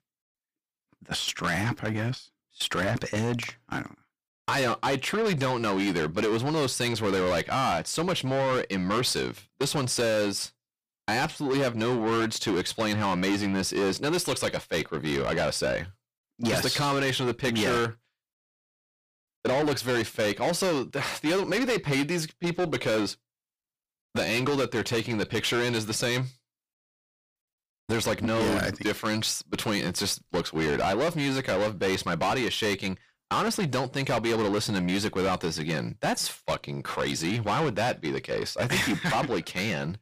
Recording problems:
distortion; heavy; 6 dB below the speech

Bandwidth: 15 kHz